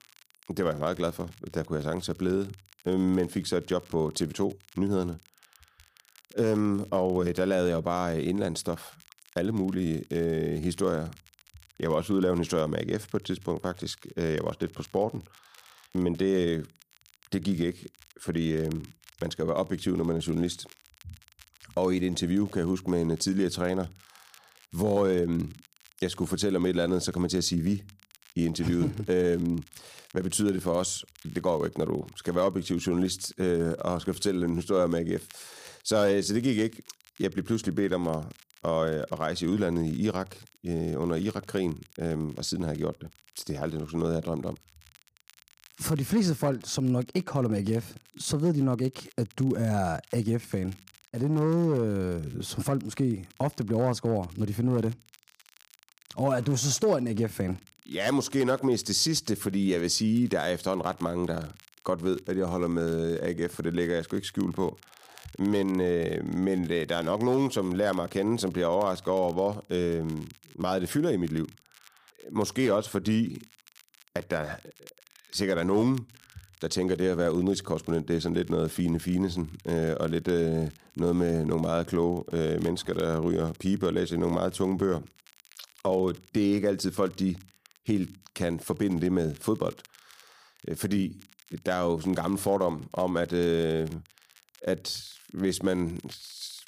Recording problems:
crackle, like an old record; faint; 25 dB below the speech

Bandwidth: 15 kHz